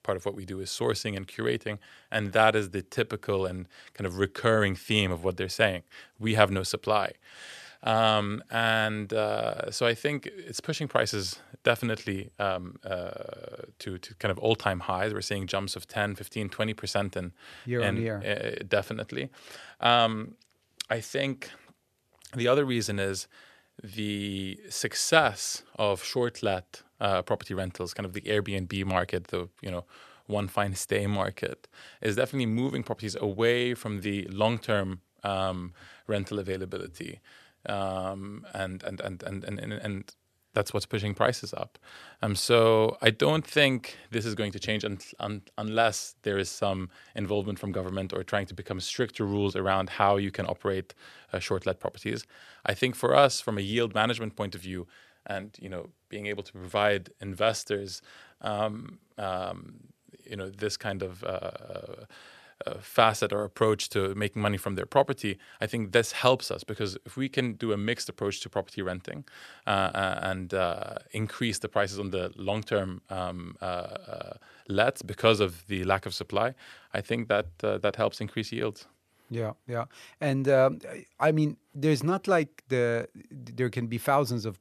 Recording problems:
none

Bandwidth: 14 kHz